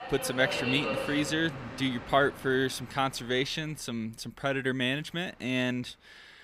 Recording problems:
train or aircraft noise; loud; throughout; 7 dB below the speech

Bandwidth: 15.5 kHz